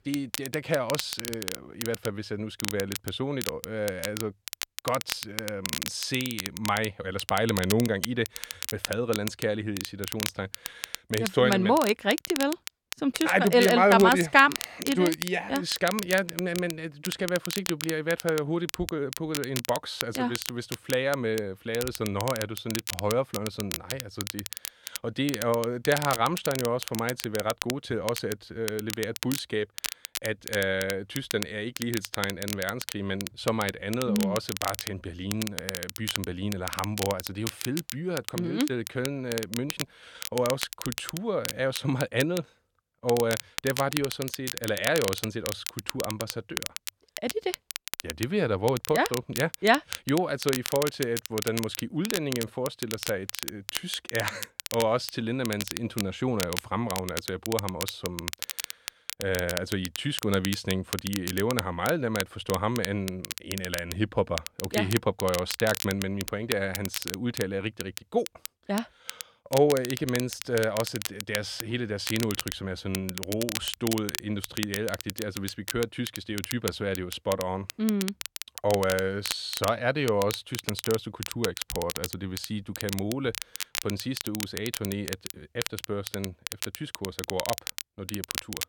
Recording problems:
crackle, like an old record; loud; 6 dB below the speech

